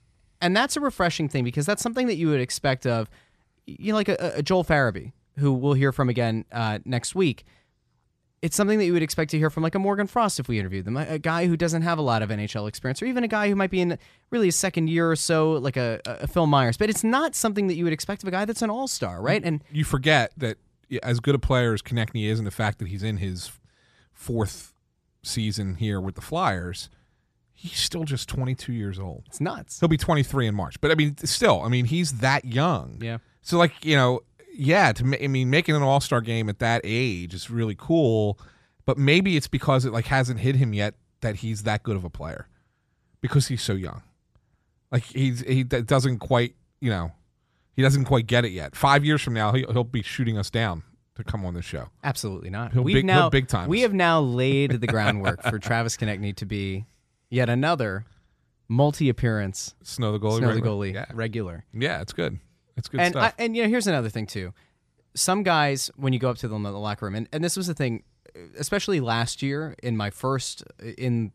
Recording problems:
none

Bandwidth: 14 kHz